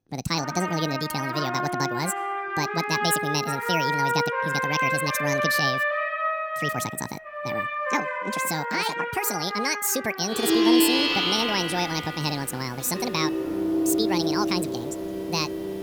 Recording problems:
wrong speed and pitch; too fast and too high; 1.7 times normal speed
background music; very loud; throughout; 2 dB above the speech

